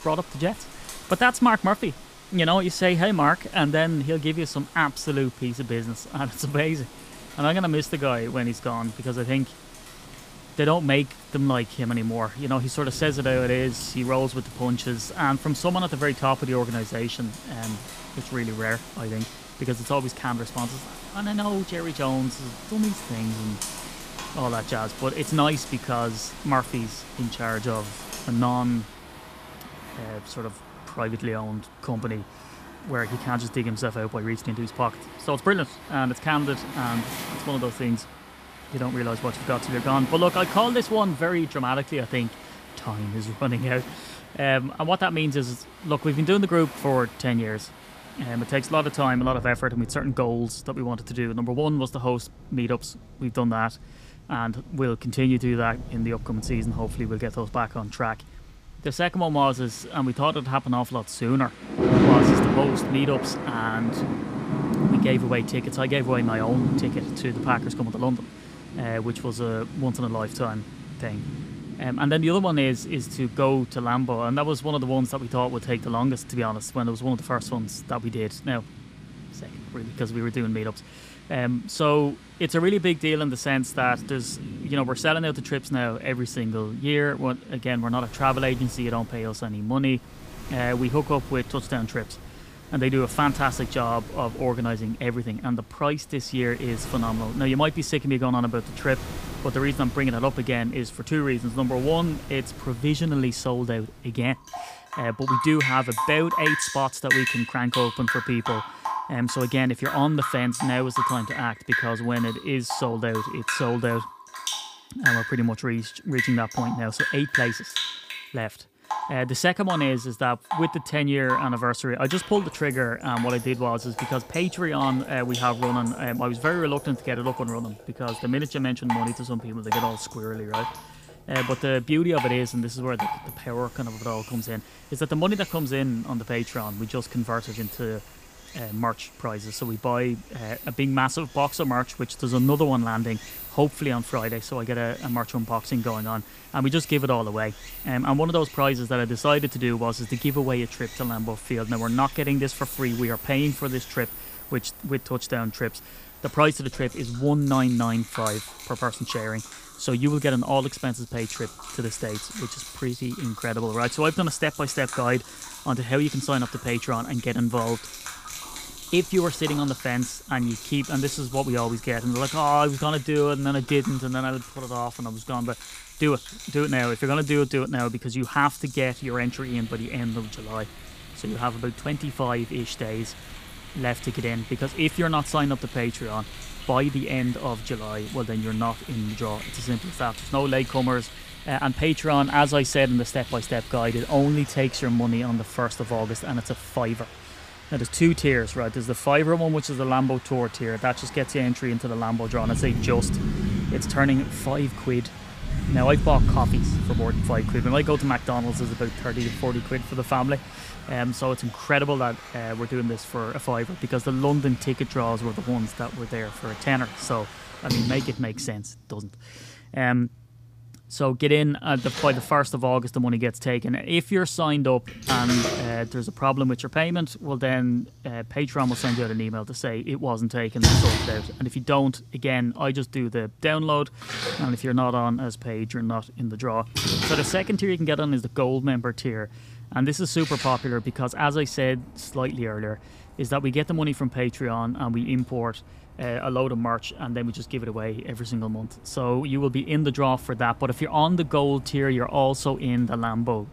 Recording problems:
rain or running water; loud; throughout; 7 dB below the speech

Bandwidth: 15 kHz